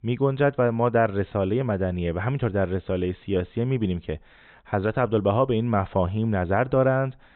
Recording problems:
high frequencies cut off; severe; nothing above 4 kHz

